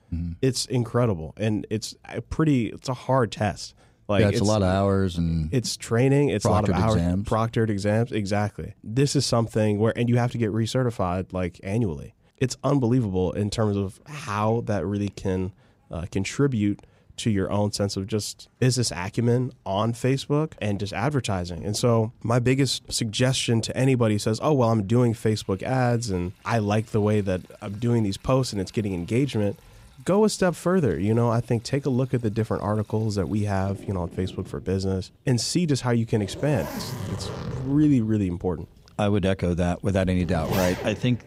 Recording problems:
household noises; noticeable; throughout; 10 dB below the speech

